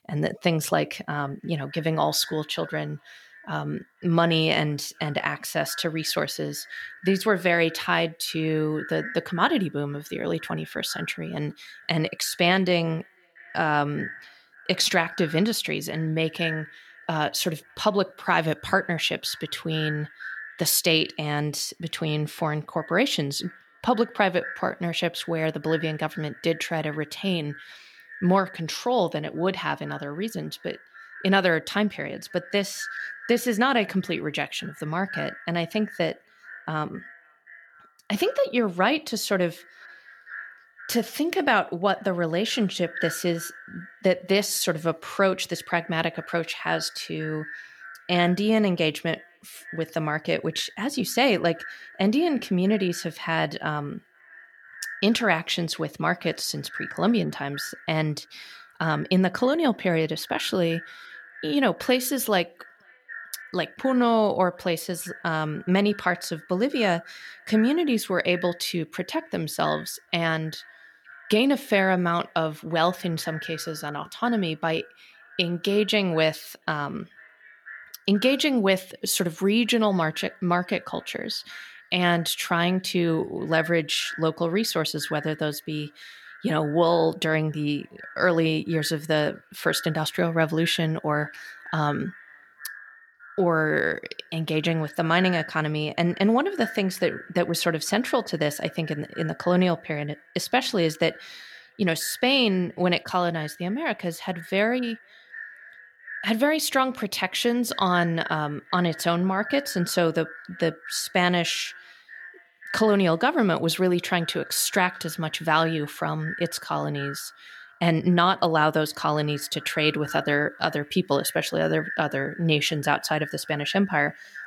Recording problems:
echo of what is said; noticeable; throughout; 490 ms later, 15 dB below the speech

